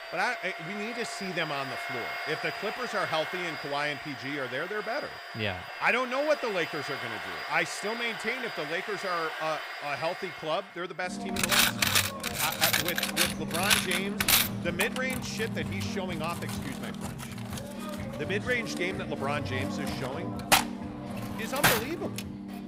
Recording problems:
household noises; very loud; throughout; 2 dB above the speech

